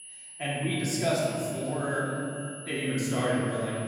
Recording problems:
room echo; strong; dies away in 2.6 s
off-mic speech; far
echo of what is said; noticeable; throughout; 500 ms later, 20 dB below the speech
high-pitched whine; noticeable; throughout; 10 kHz, 10 dB below the speech

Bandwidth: 16.5 kHz